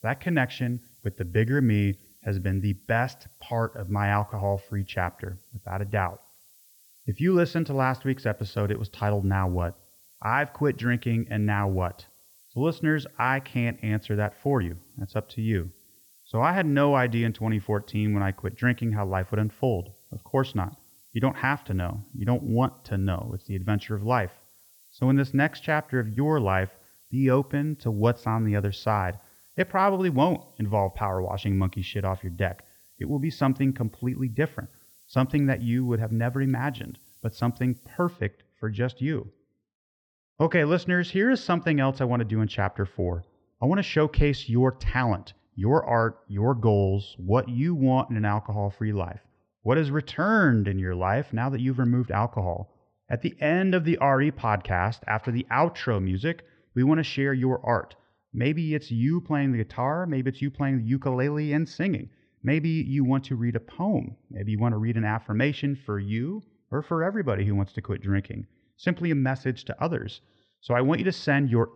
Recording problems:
muffled; slightly; fading above 4 kHz
hiss; faint; until 38 s; 25 dB below the speech

